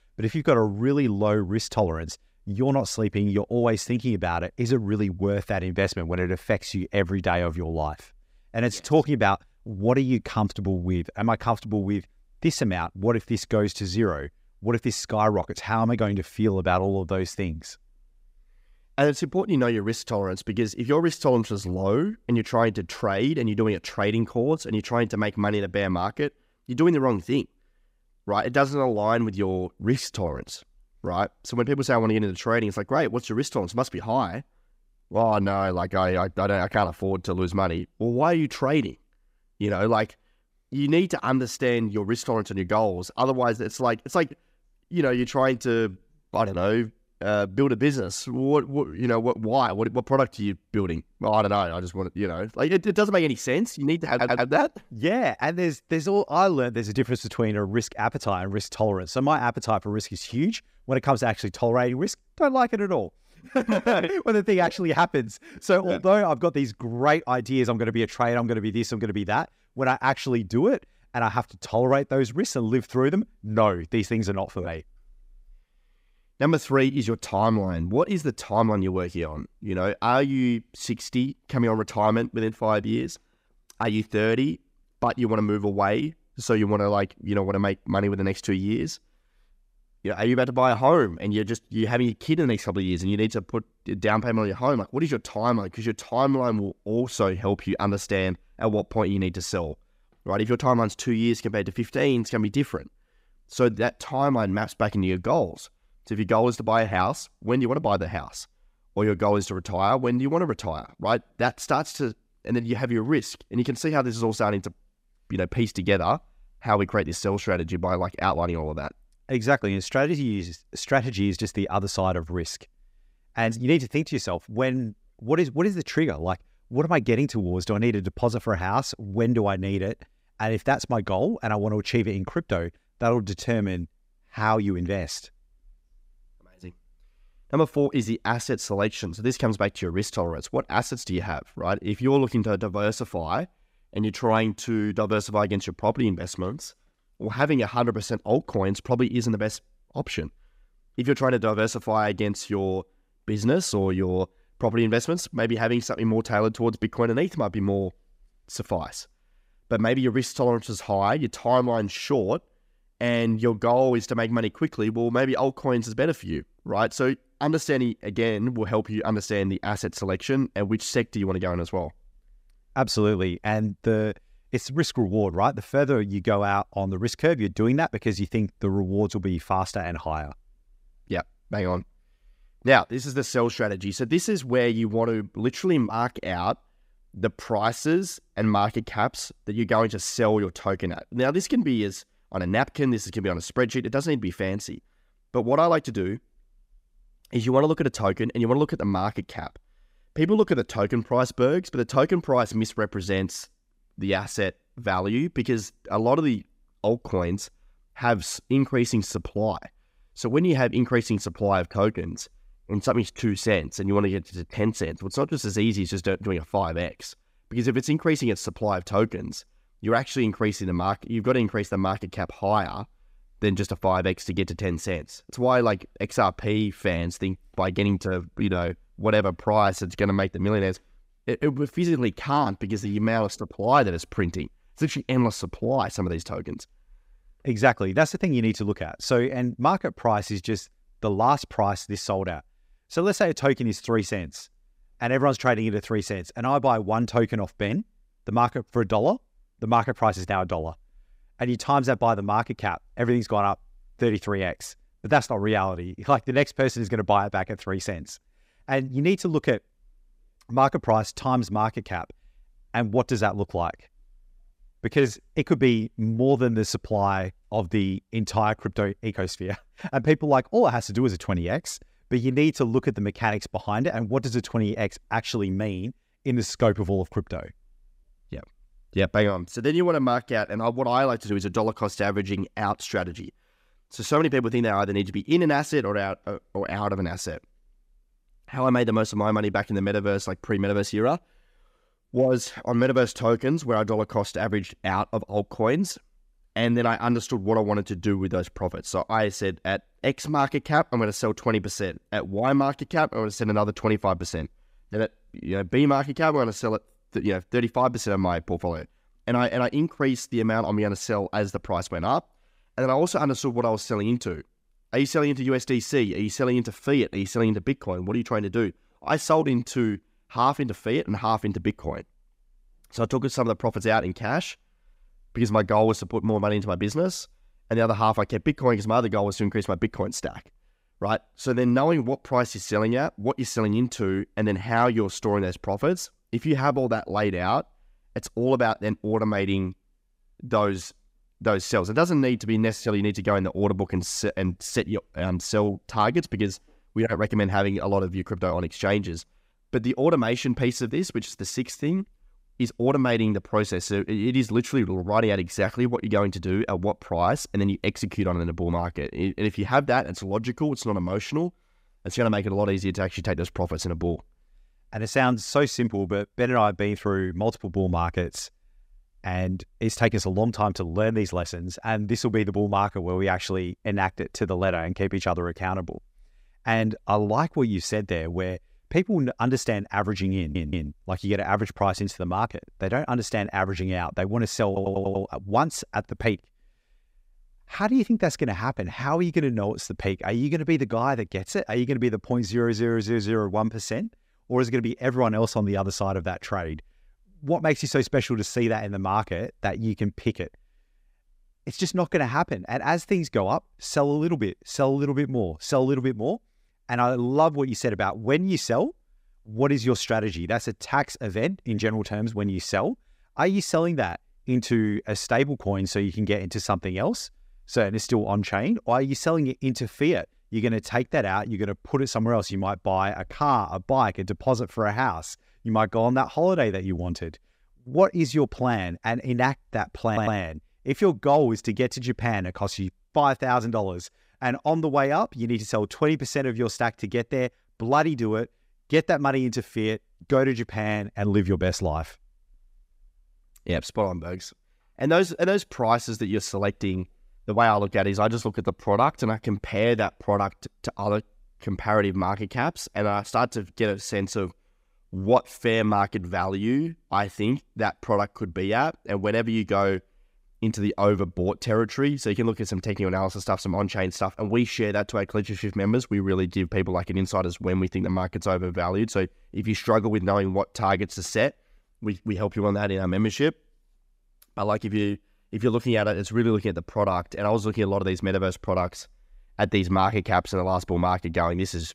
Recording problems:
audio stuttering; 4 times, first at 54 s

